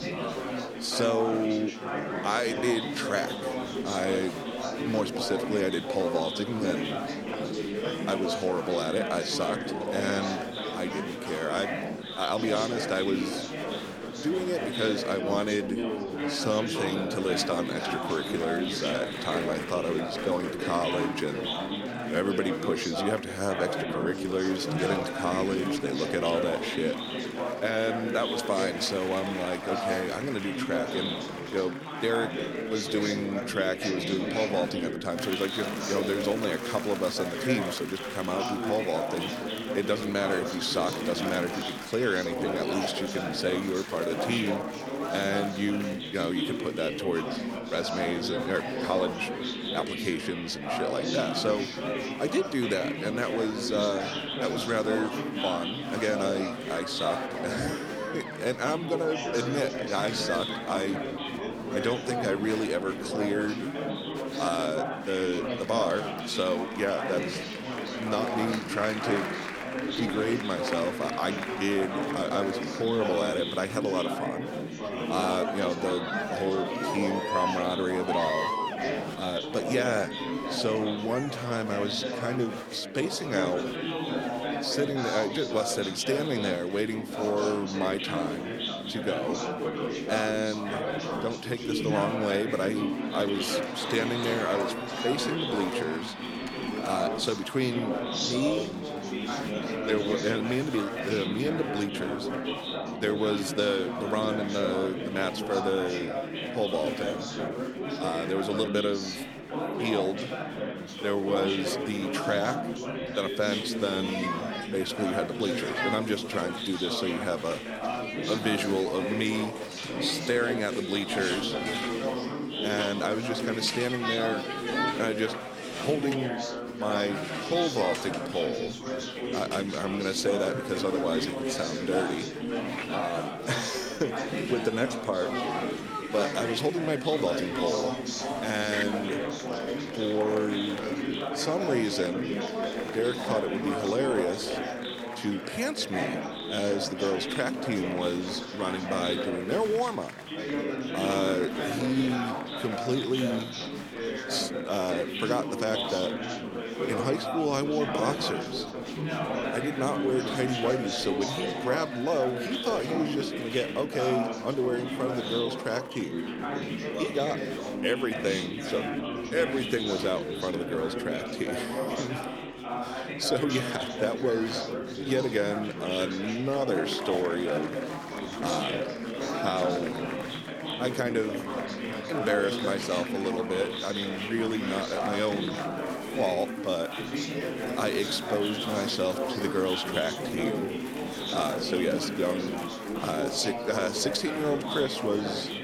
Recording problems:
chatter from many people; loud; throughout; 2 dB below the speech

